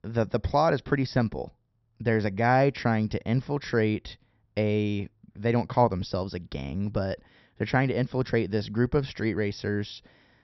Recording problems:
high frequencies cut off; noticeable; nothing above 5.5 kHz

